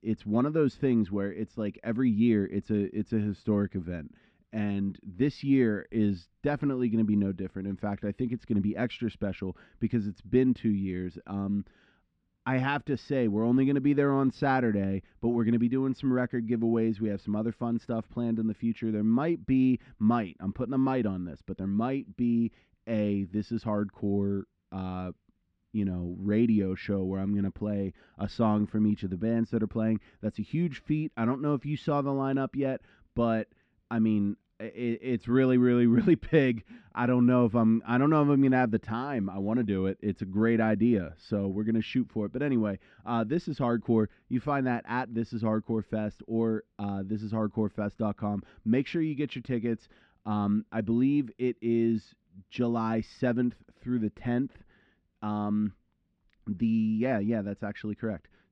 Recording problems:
muffled; slightly; fading above 3 kHz

